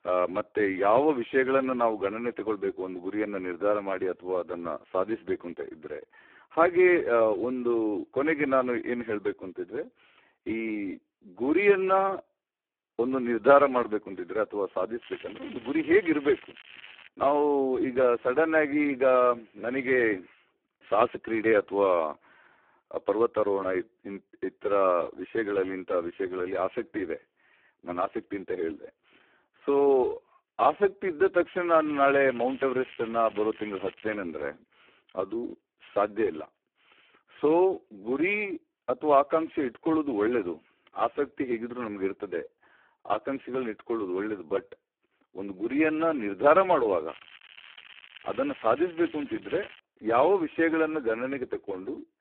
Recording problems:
phone-call audio; poor line; nothing above 3.5 kHz
crackling; faint; from 15 to 17 s, from 32 to 34 s and from 47 to 50 s; 20 dB below the speech

